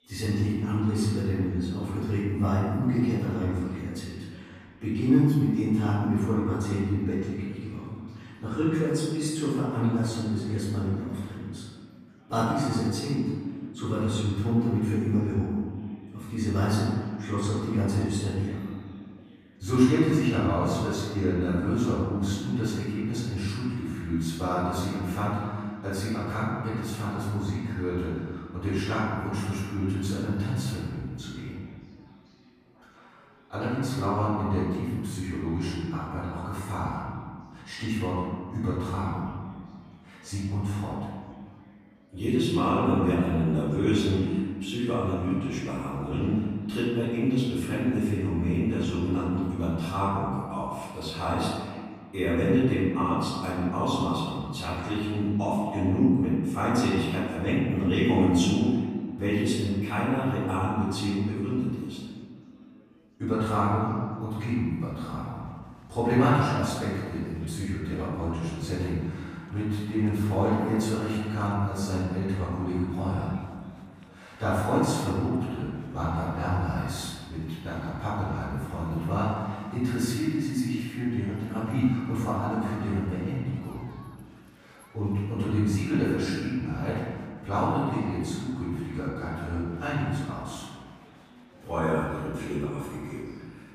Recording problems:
room echo; strong; dies away in 1.7 s
off-mic speech; far
chatter from many people; faint; throughout; 30 dB below the speech

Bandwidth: 15 kHz